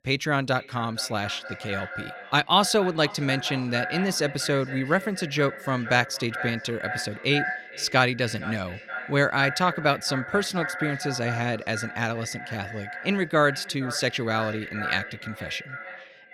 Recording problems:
echo of what is said; strong; throughout; 460 ms later, 9 dB below the speech

